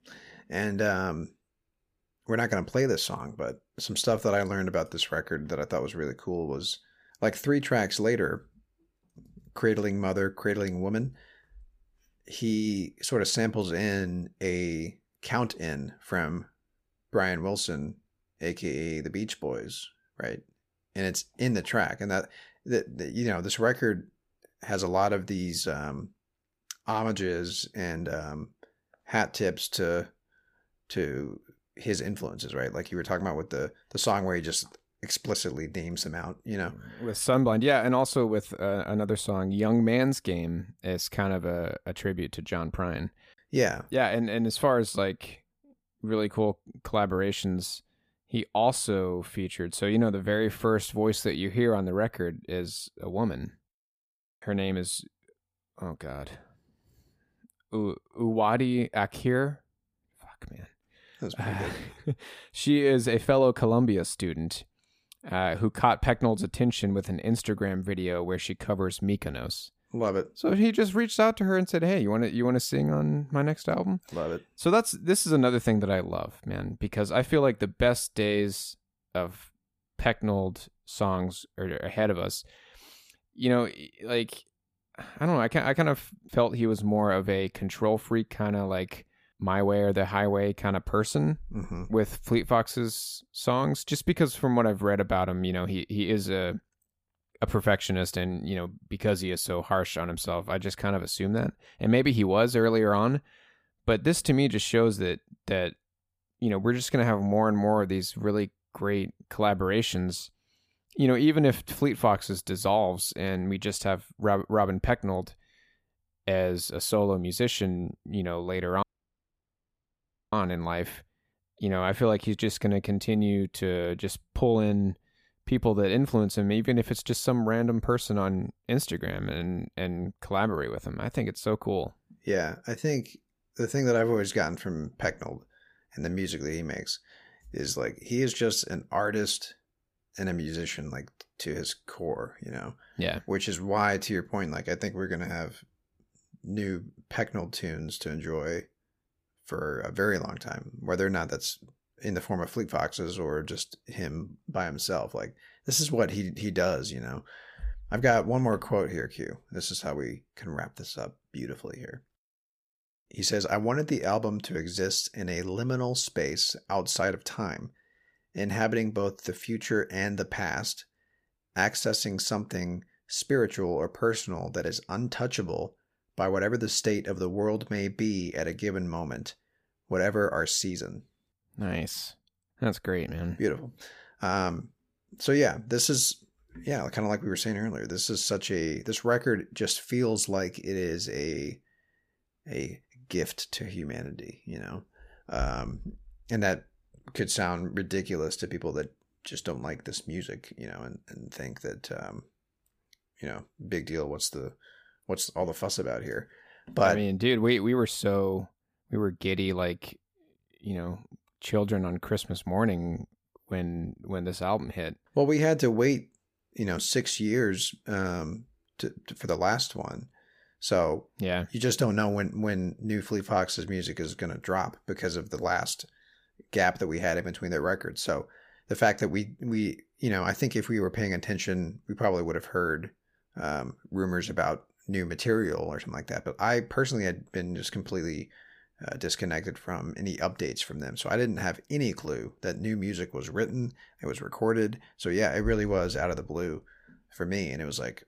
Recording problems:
audio cutting out; at 1:59 for 1.5 s

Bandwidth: 15 kHz